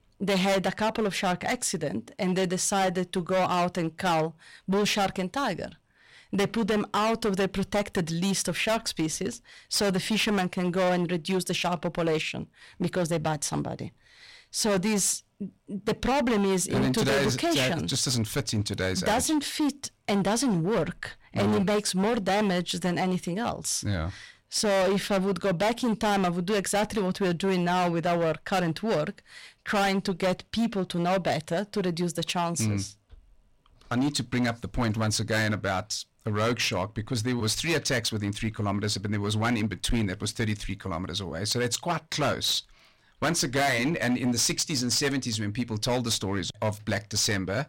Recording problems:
distortion; heavy; 15% of the sound clipped

